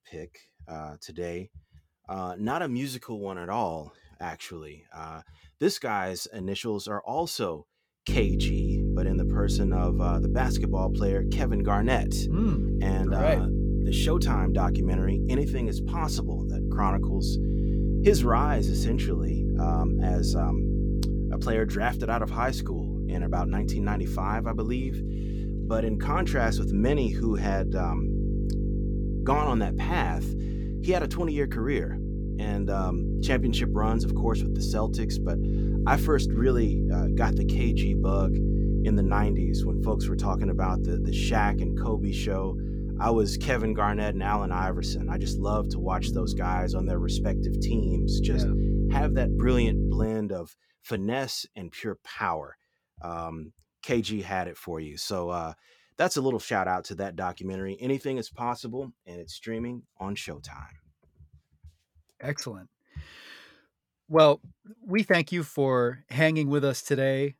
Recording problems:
electrical hum; loud; from 8 to 50 s; 50 Hz, 7 dB below the speech

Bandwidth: 18.5 kHz